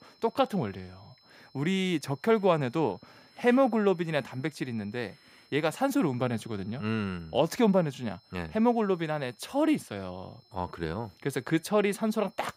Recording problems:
high-pitched whine; faint; throughout; 5 kHz, 30 dB below the speech

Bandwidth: 15.5 kHz